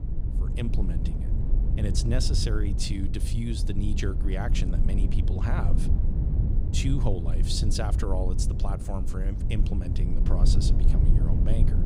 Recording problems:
low rumble; loud; throughout; 5 dB below the speech

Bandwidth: 15.5 kHz